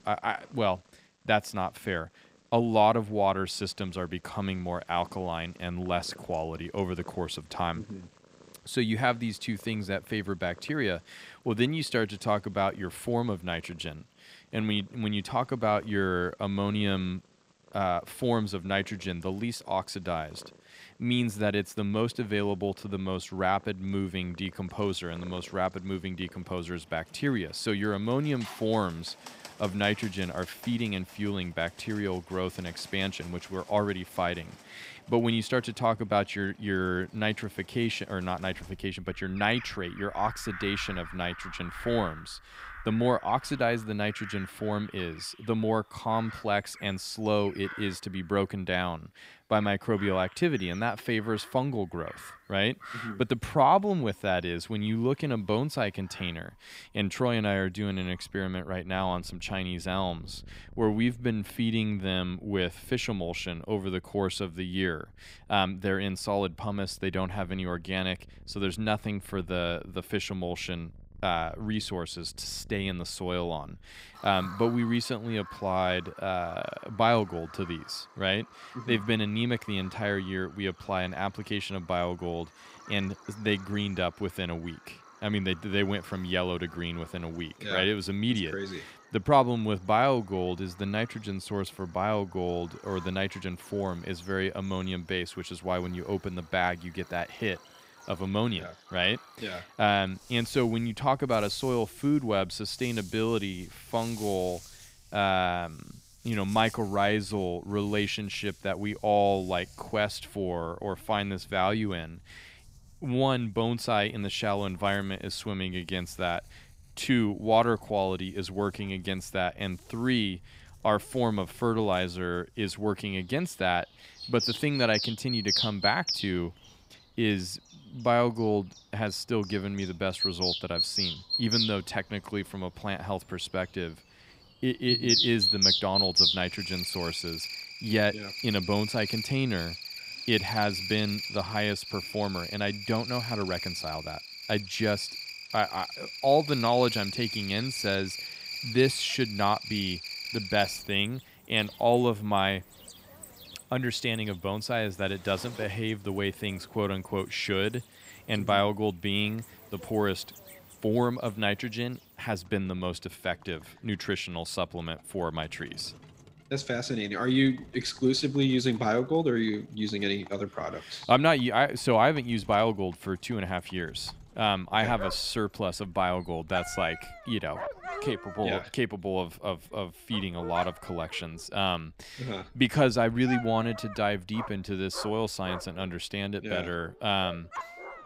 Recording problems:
animal sounds; loud; throughout; 4 dB below the speech

